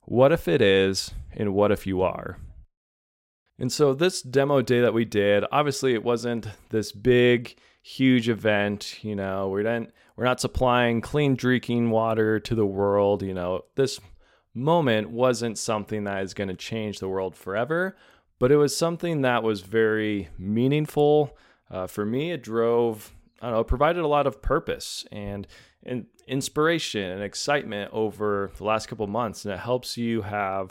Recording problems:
none

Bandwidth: 16 kHz